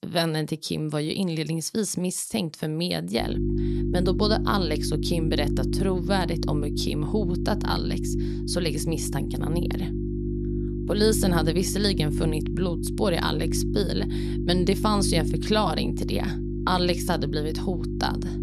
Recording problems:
electrical hum; loud; from 3 s on; 50 Hz, 6 dB below the speech

